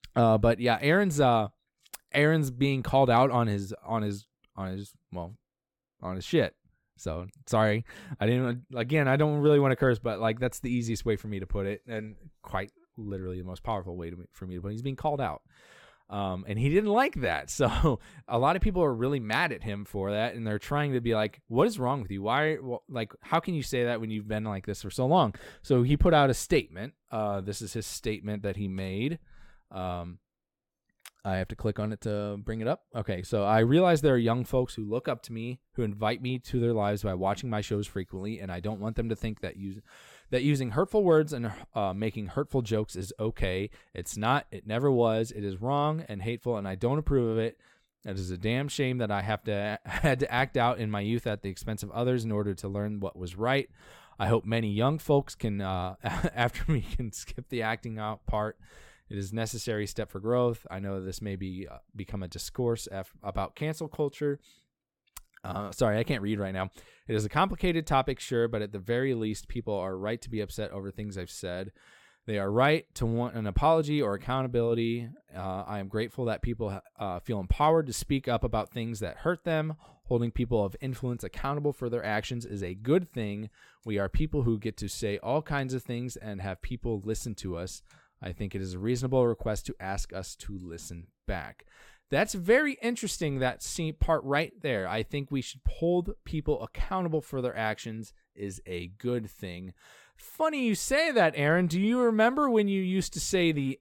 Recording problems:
none

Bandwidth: 17 kHz